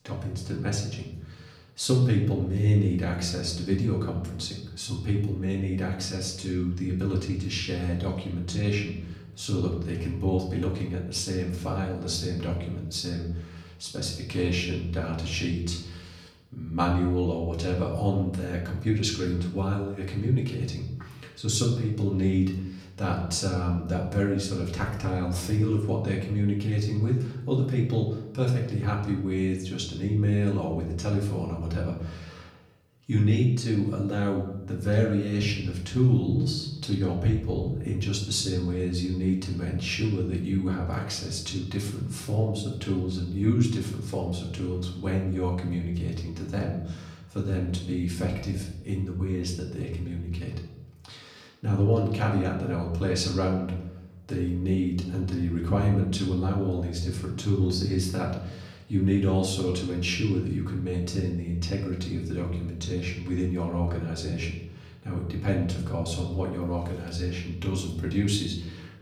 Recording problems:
off-mic speech; far
room echo; slight; dies away in 0.8 s

